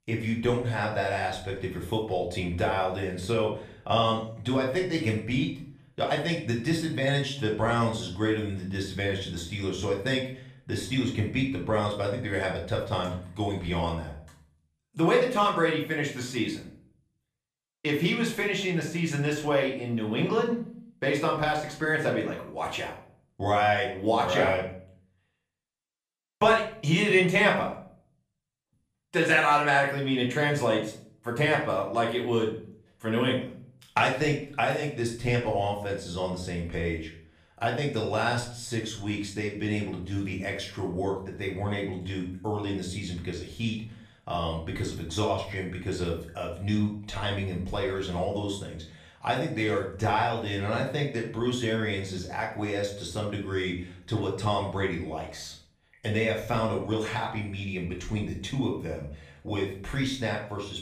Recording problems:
off-mic speech; far
room echo; slight; dies away in 0.5 s

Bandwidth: 14.5 kHz